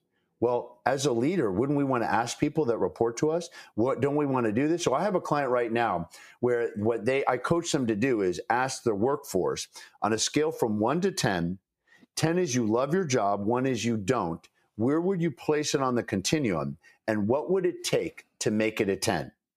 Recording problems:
squashed, flat; somewhat

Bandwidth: 15 kHz